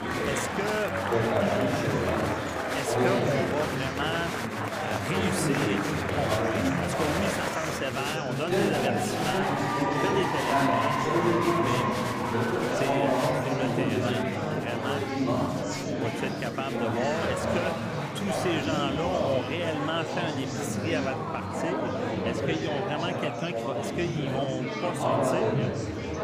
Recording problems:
murmuring crowd; very loud; throughout; 5 dB above the speech

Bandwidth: 15 kHz